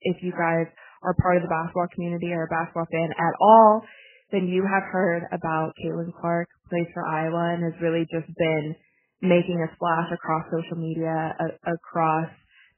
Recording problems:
garbled, watery; badly; nothing above 3 kHz

